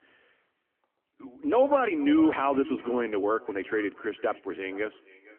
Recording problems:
echo of what is said; faint; throughout; 460 ms later, 20 dB below the speech
phone-call audio; nothing above 3 kHz
uneven, jittery; strongly; from 1.5 to 5 s

